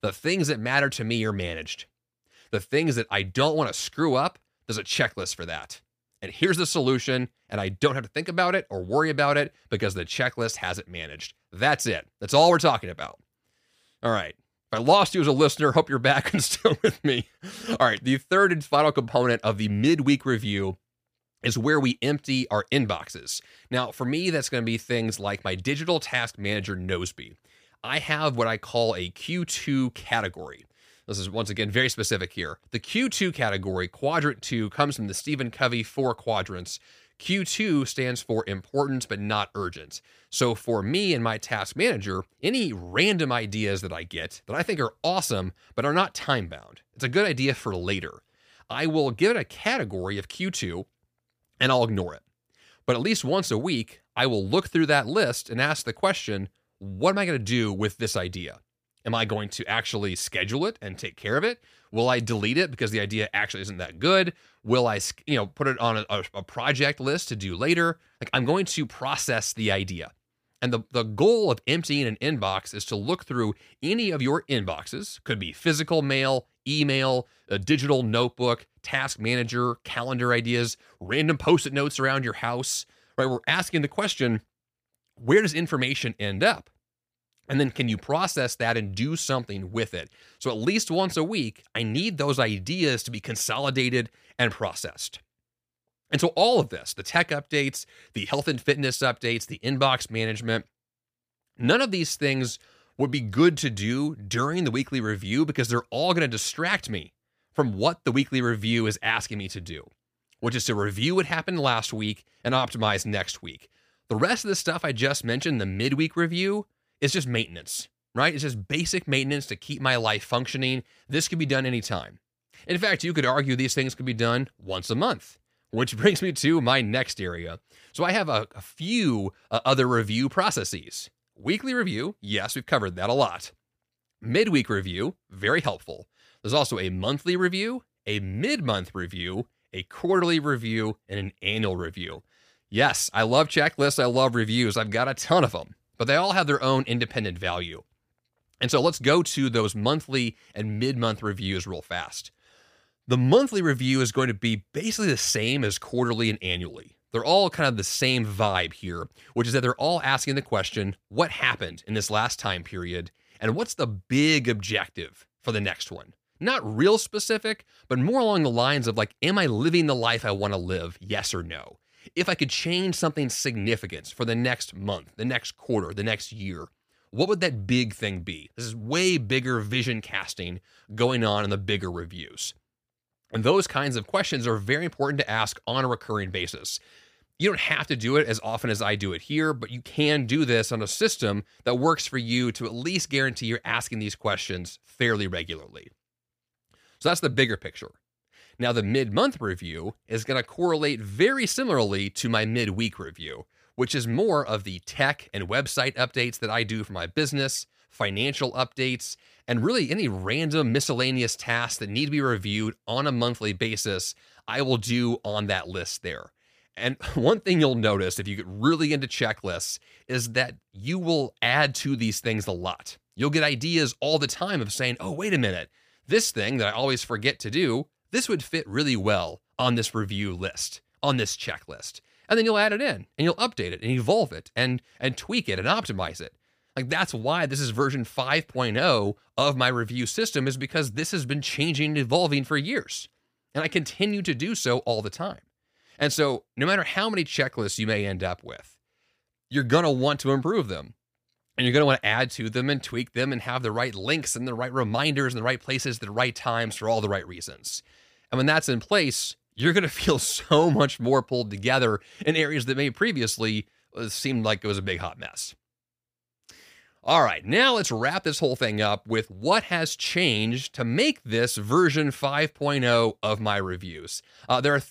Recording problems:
none

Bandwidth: 15 kHz